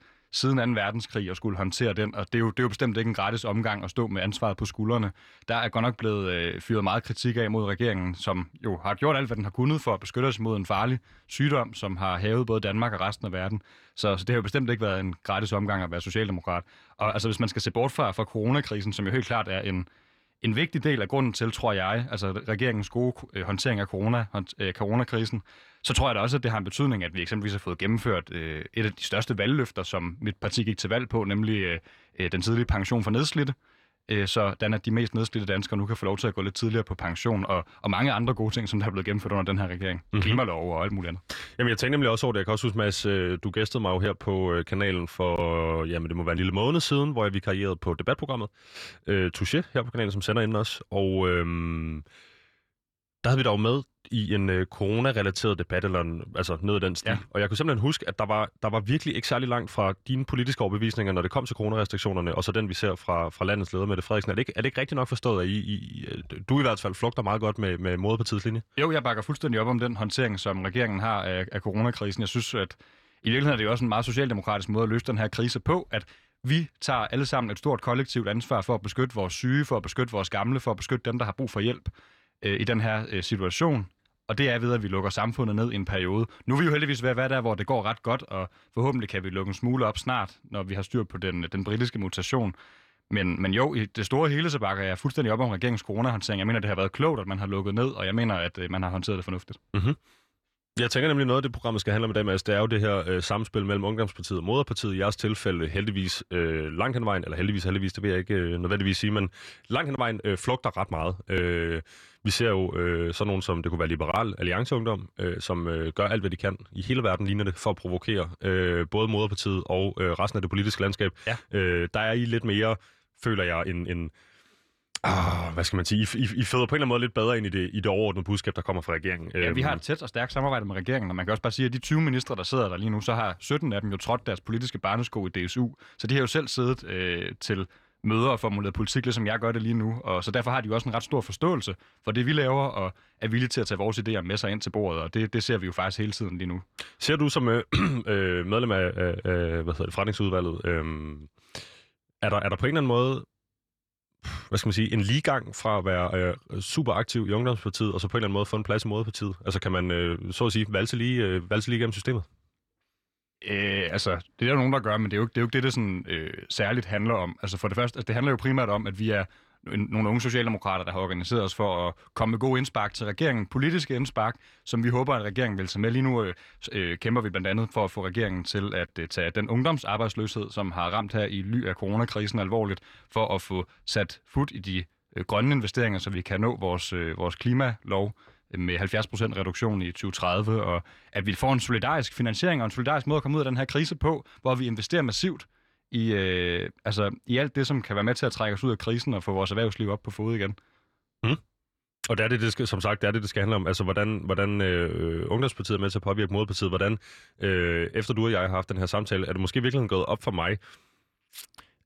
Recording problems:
none

